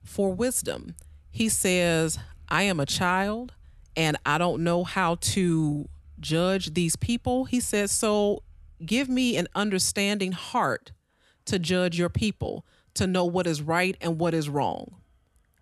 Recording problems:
traffic noise; faint; throughout; 25 dB below the speech

